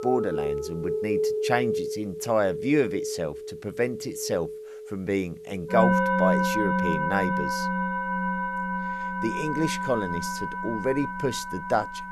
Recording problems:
background music; very loud; throughout; as loud as the speech

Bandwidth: 13.5 kHz